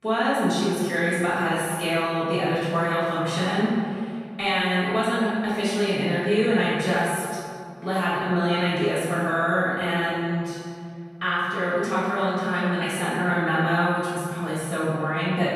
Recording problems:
room echo; strong; dies away in 2.1 s
off-mic speech; far

